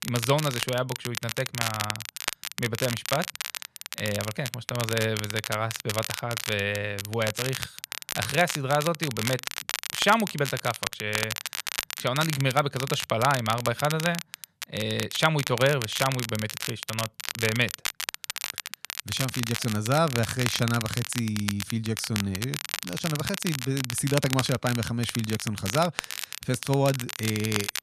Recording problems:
crackle, like an old record; loud; 5 dB below the speech

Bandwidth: 14 kHz